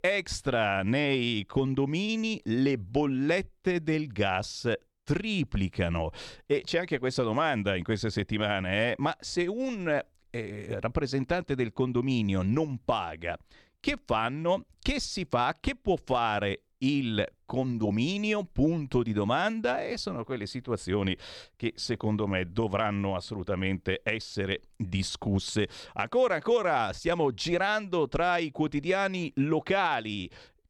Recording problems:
none

